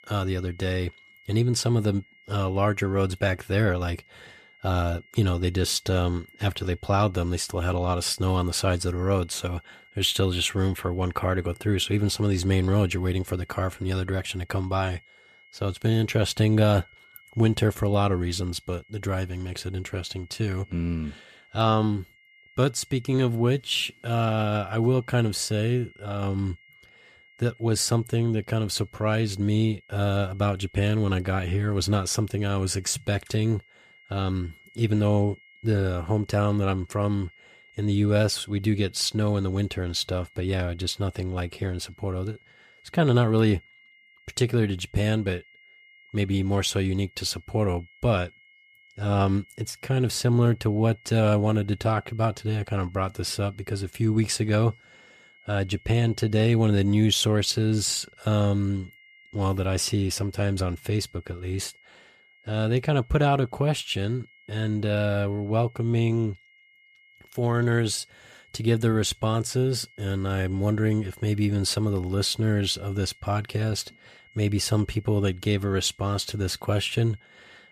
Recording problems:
high-pitched whine; faint; throughout; 2 kHz, 30 dB below the speech

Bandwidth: 14.5 kHz